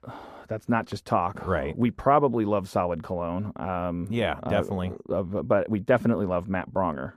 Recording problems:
muffled; slightly; fading above 1.5 kHz

